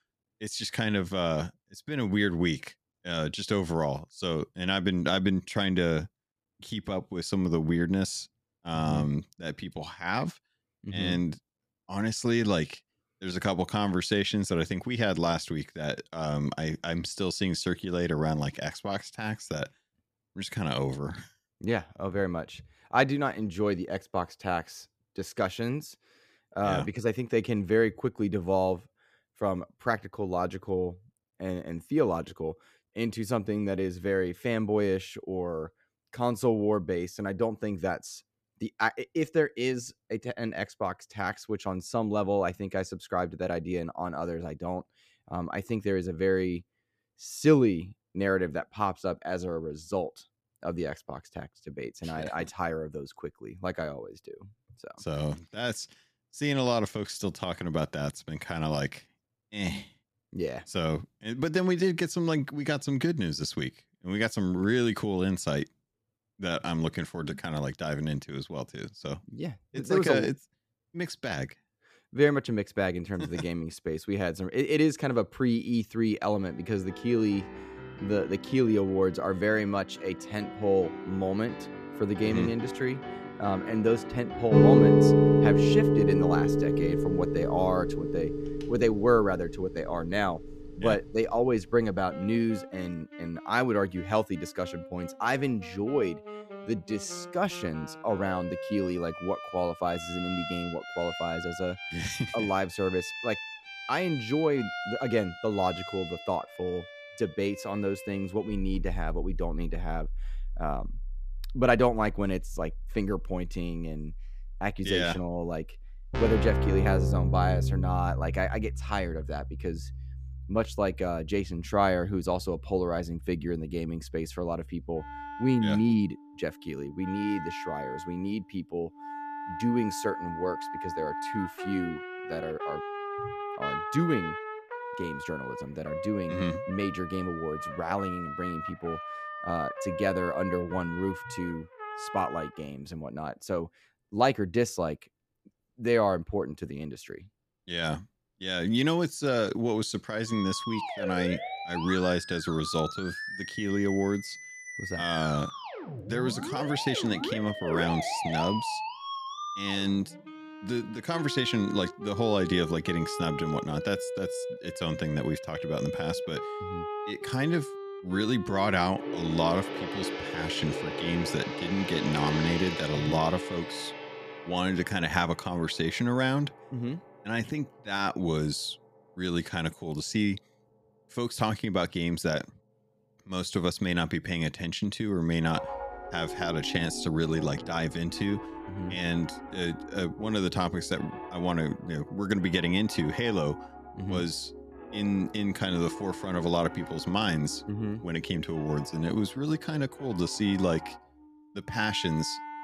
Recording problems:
background music; loud; from 1:17 on; 3 dB below the speech

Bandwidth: 14.5 kHz